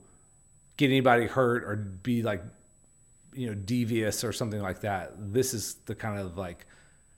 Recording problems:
high-pitched whine; faint; throughout; 8 kHz, 35 dB below the speech

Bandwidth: 16 kHz